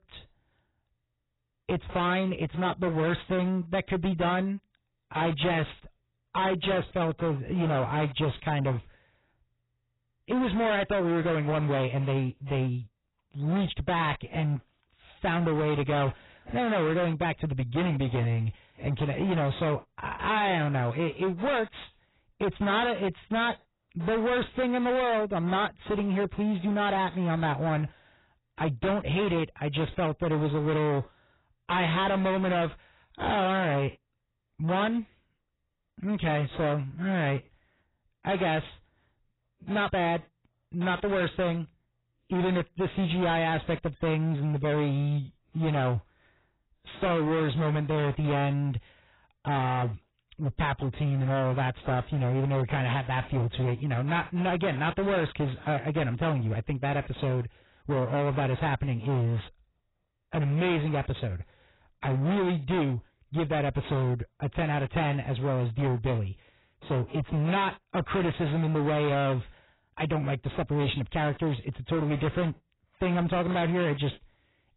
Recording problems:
distortion; heavy; 23% of the sound clipped
garbled, watery; badly; nothing above 4 kHz

